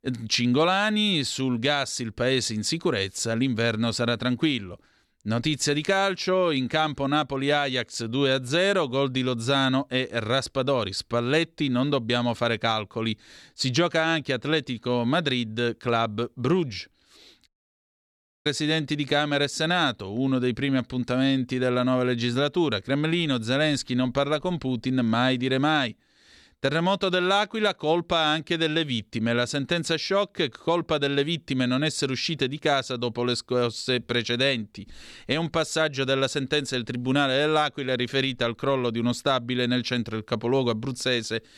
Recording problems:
audio cutting out; at 17 s for 1 s

